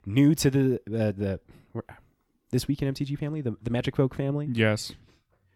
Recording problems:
none

